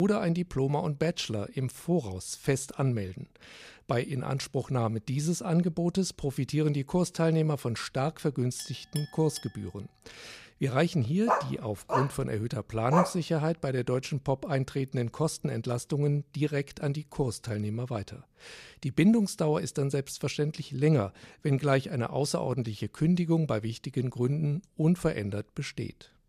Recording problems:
abrupt cut into speech; at the start
clattering dishes; faint; at 8.5 s; peak 15 dB below the speech
dog barking; loud; from 11 to 13 s; peak 1 dB above the speech

